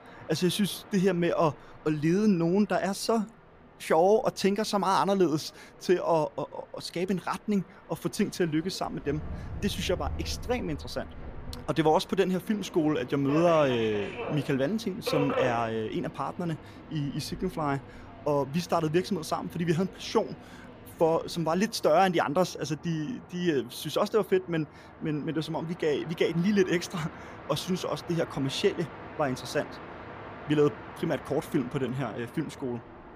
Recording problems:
train or aircraft noise; noticeable; throughout; 15 dB below the speech

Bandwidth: 15 kHz